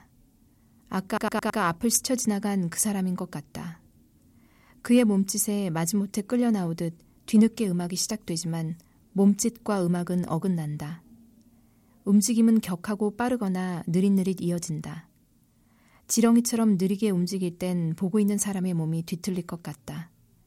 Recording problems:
audio stuttering; at 1 s

